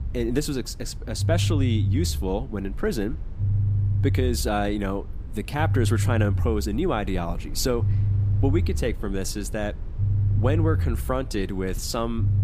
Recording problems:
low rumble; noticeable; throughout; 10 dB below the speech

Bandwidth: 15 kHz